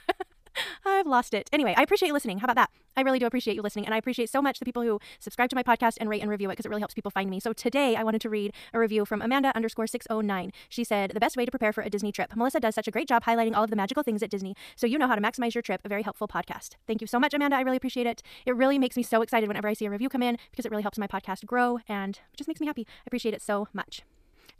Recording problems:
wrong speed, natural pitch; too fast; 1.8 times normal speed

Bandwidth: 14.5 kHz